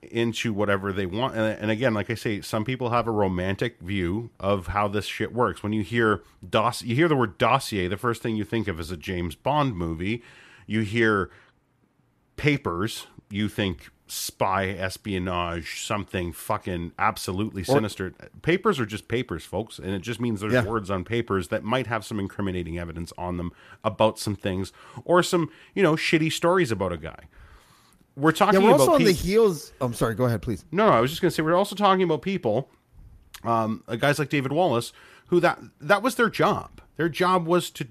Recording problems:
none

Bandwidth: 14.5 kHz